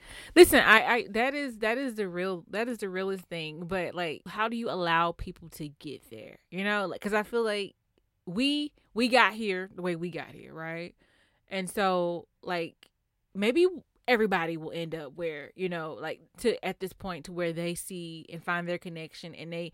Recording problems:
none

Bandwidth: 16 kHz